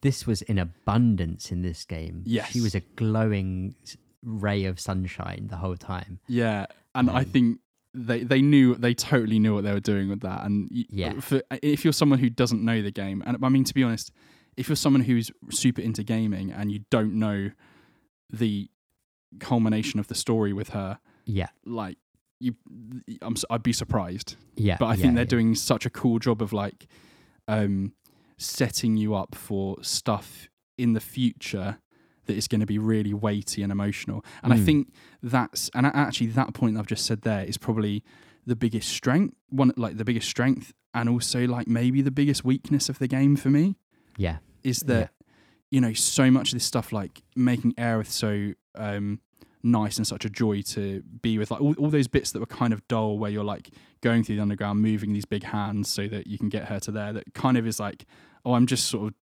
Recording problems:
none

